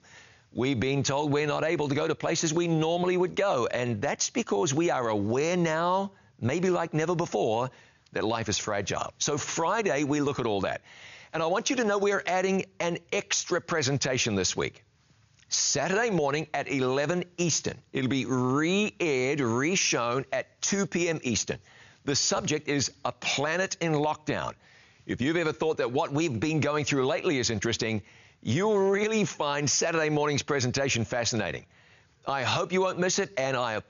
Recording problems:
high frequencies cut off; noticeable; nothing above 7 kHz
squashed, flat; somewhat

